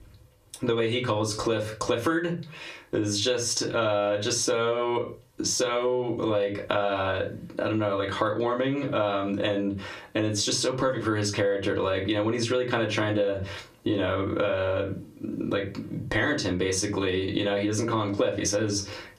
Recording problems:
off-mic speech; far
squashed, flat; heavily
room echo; very slight; dies away in 0.2 s

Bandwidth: 14.5 kHz